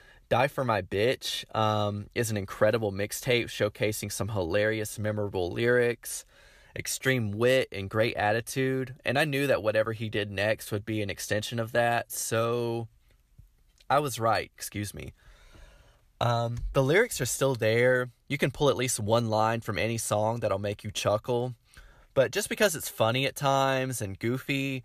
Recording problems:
none

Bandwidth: 14.5 kHz